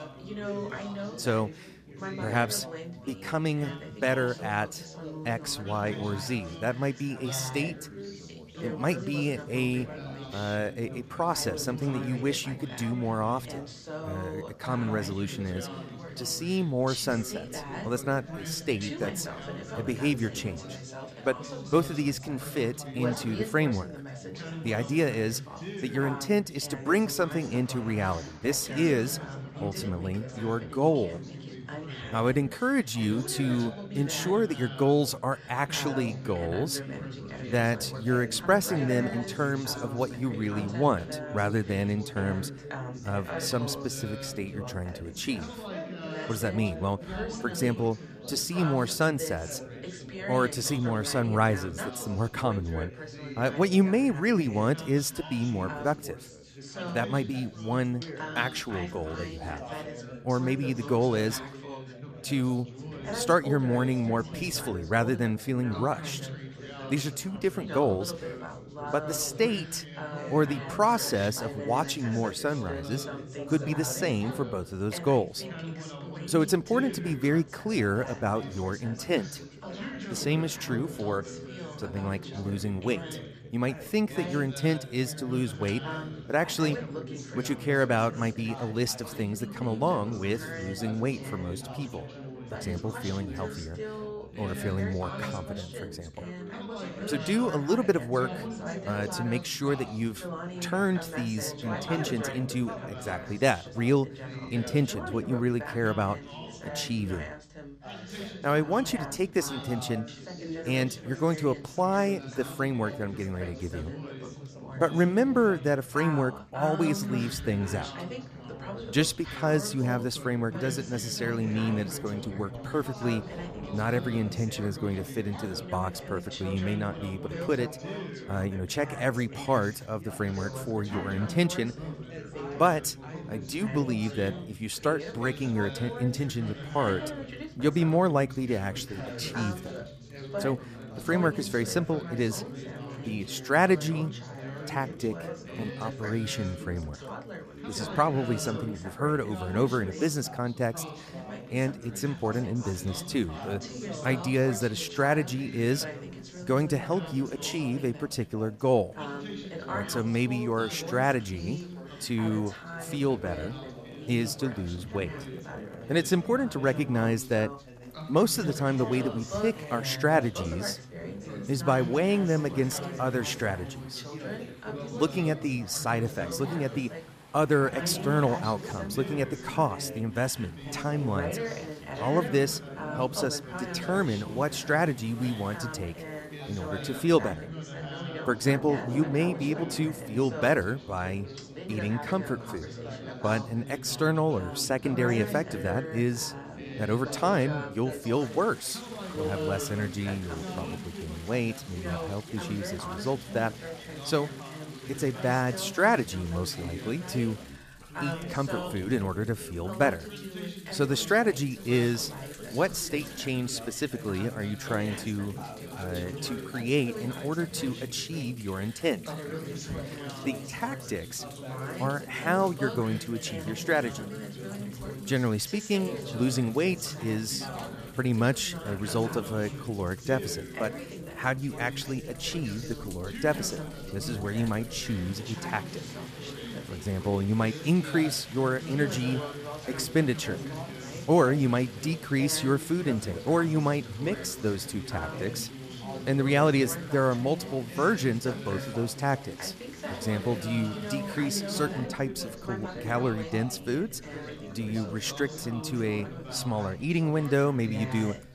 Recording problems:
background chatter; loud; throughout; 4 voices, 9 dB below the speech
rain or running water; faint; throughout; 20 dB below the speech

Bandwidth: 14.5 kHz